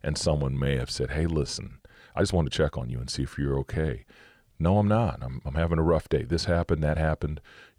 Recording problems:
uneven, jittery; strongly; from 0.5 to 7 s

